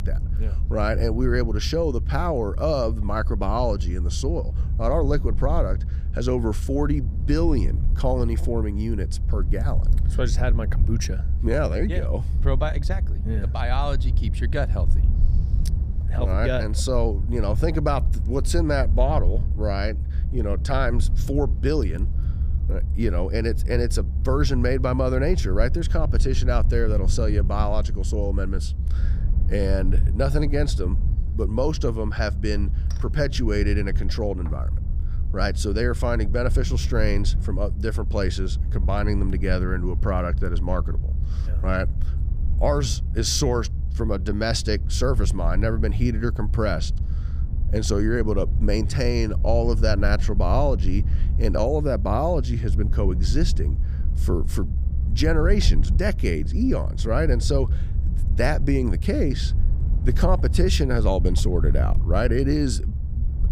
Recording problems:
low rumble; noticeable; throughout; 15 dB below the speech

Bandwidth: 15.5 kHz